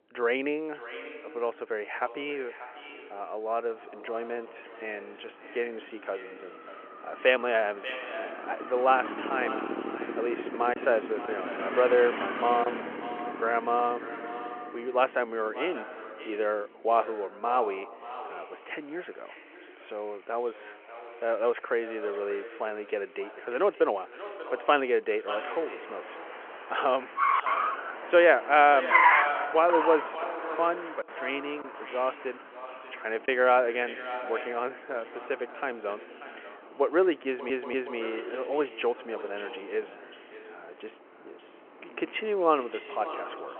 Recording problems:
echo of what is said; noticeable; throughout; 590 ms later, 10 dB below the speech
phone-call audio
traffic noise; loud; throughout; 3 dB below the speech
choppy; occasionally; from 11 to 13 s, from 30 to 32 s and at 33 s; 3% of the speech affected
audio stuttering; at 37 s

